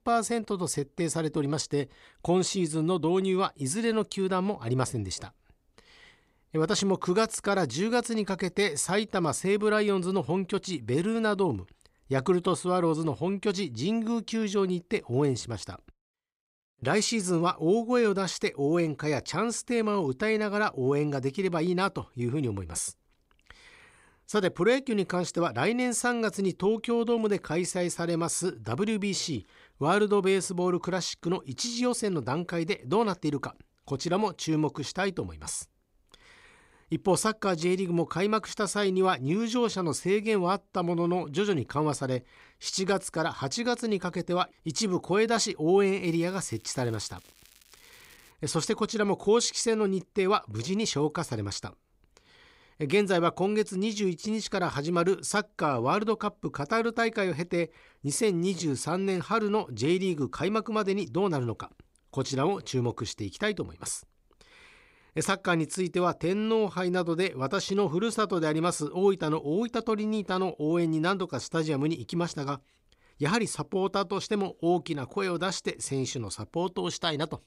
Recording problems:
crackling; faint; from 46 to 48 s; 25 dB below the speech

